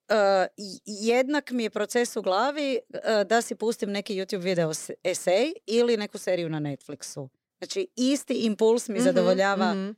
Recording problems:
none

